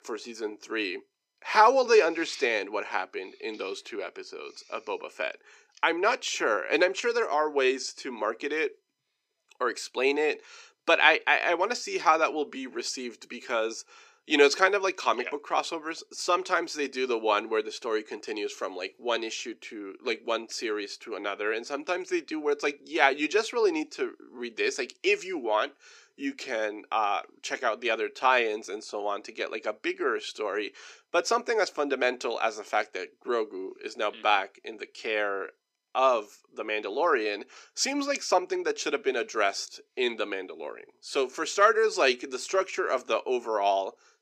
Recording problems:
thin; somewhat; fading below 350 Hz

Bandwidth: 15 kHz